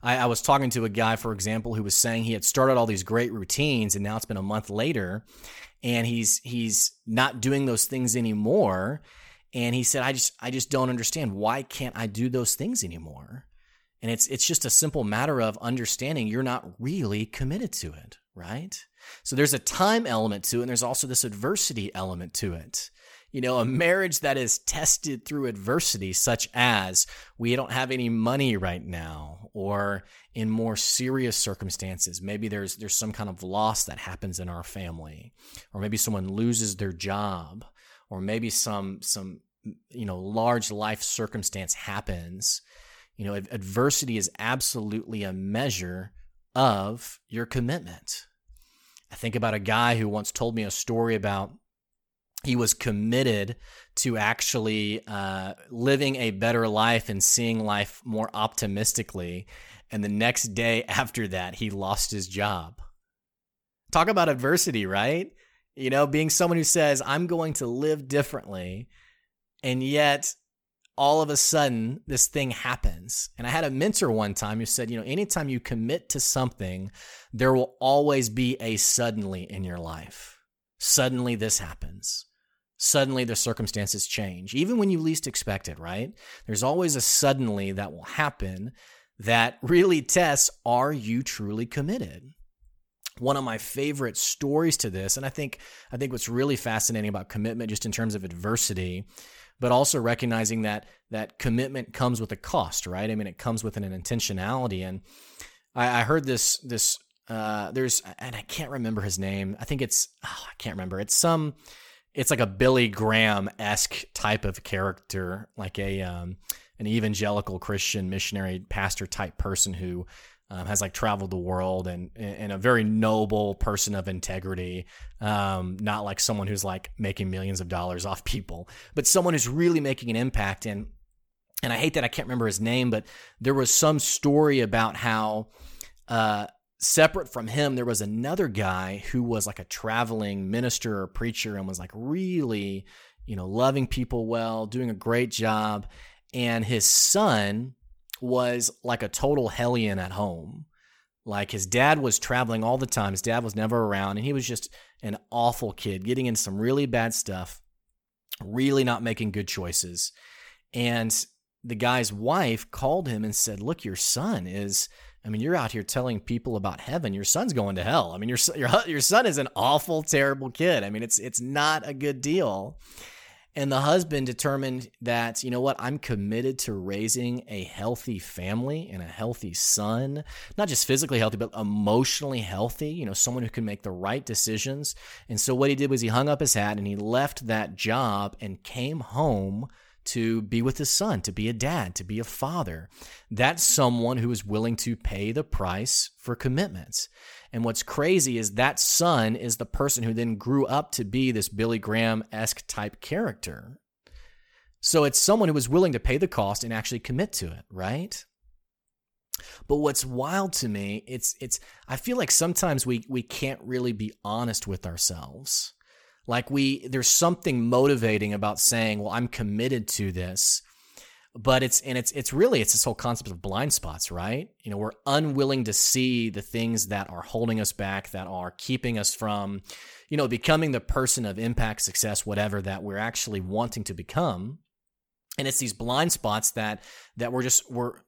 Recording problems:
none

